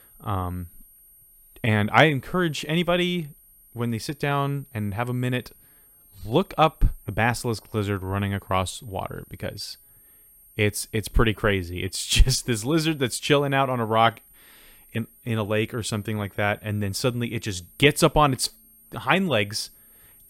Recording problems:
high-pitched whine; faint; throughout; 11.5 kHz, 25 dB below the speech

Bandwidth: 16.5 kHz